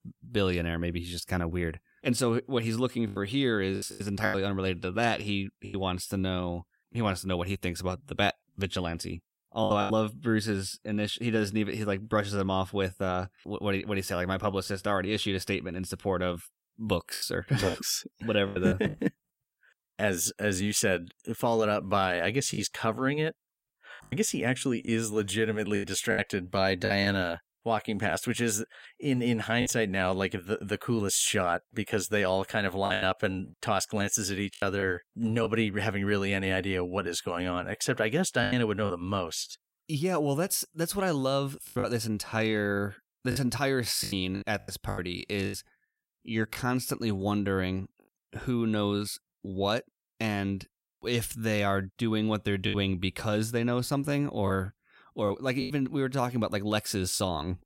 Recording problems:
choppy; occasionally; 5% of the speech affected

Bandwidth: 16 kHz